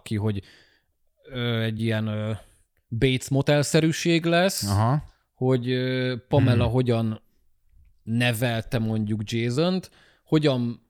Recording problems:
uneven, jittery; strongly; from 1.5 to 10 s

